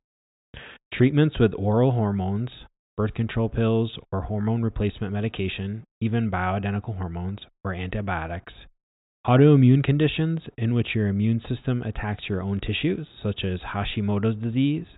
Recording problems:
high frequencies cut off; severe; nothing above 4 kHz

